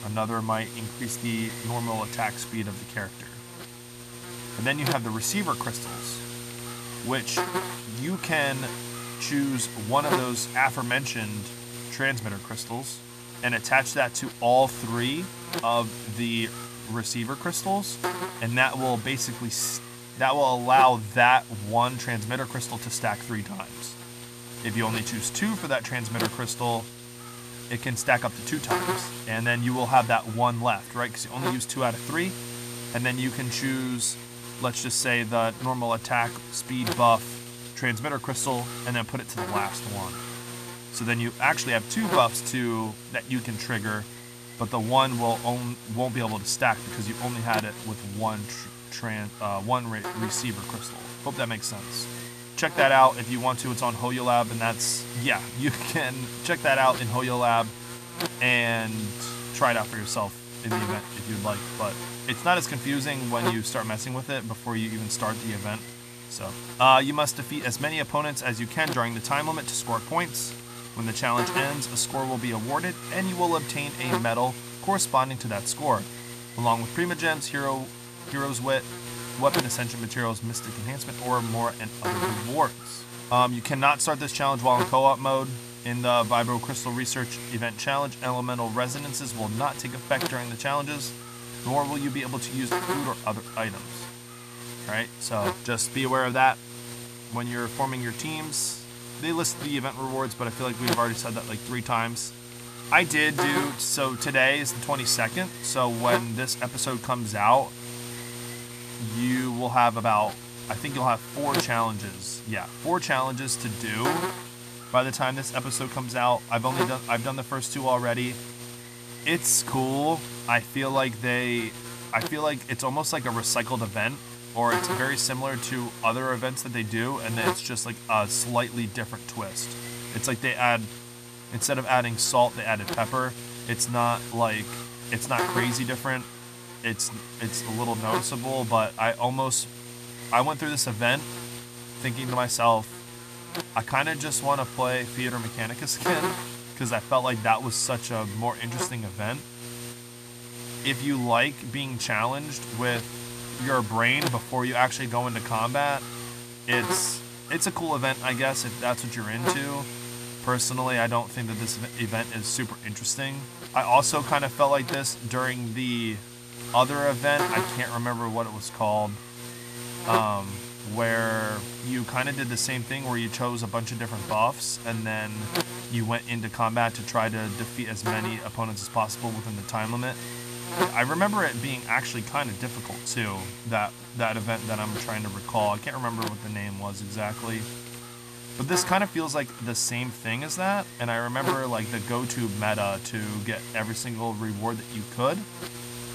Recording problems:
electrical hum; noticeable; throughout; 60 Hz, 10 dB below the speech

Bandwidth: 14.5 kHz